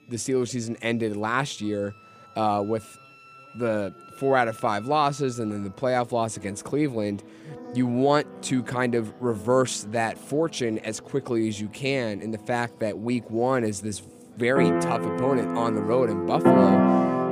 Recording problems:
background music; very loud; throughout; 3 dB above the speech
chatter from many people; faint; throughout; 30 dB below the speech

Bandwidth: 15 kHz